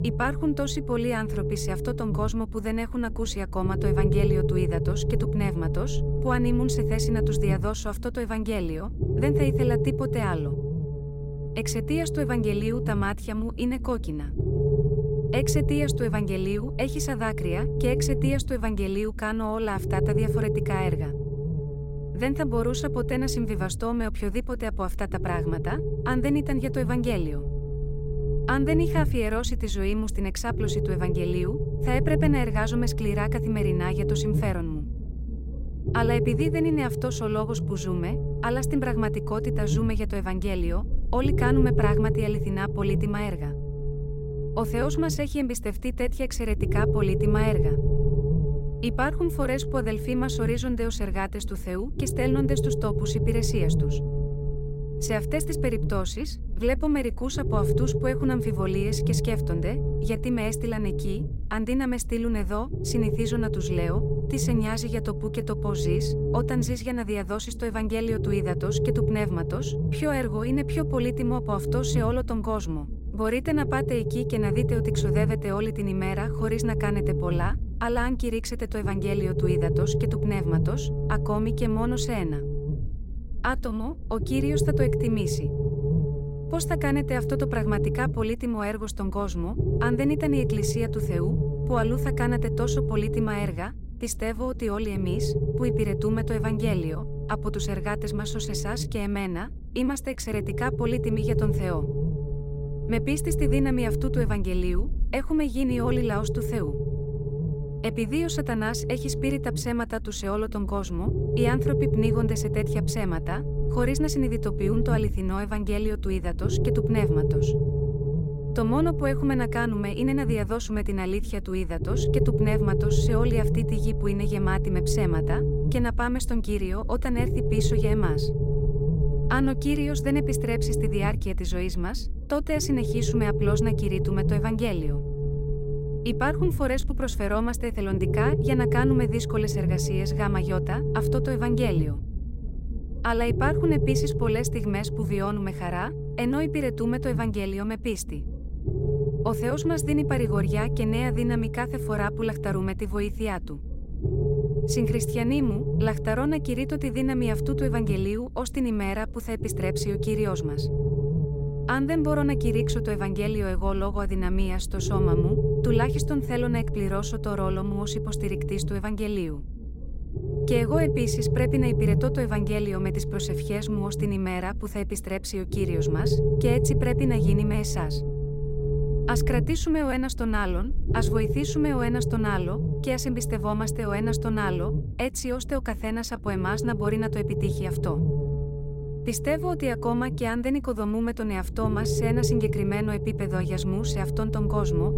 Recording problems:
low rumble; loud; throughout; 3 dB below the speech

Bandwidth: 16 kHz